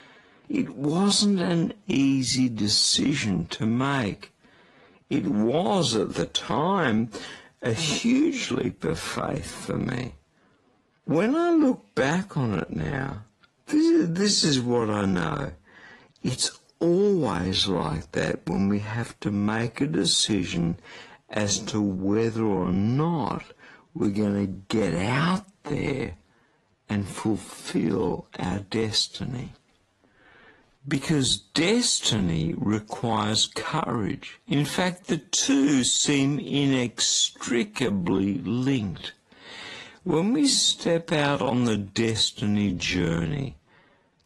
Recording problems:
wrong speed, natural pitch; too slow; 0.5 times normal speed
garbled, watery; slightly

